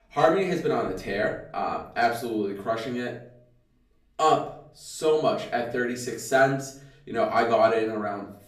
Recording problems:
off-mic speech; far
room echo; slight; dies away in 0.5 s

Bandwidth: 14.5 kHz